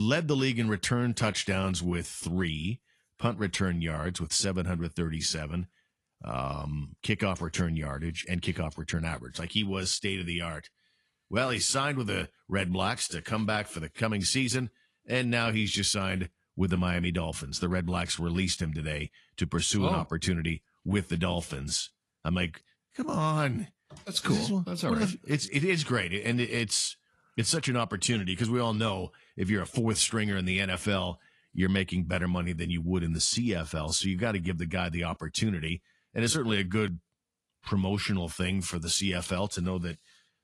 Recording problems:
garbled, watery; slightly
abrupt cut into speech; at the start

